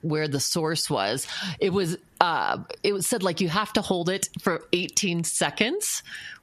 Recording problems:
squashed, flat; heavily

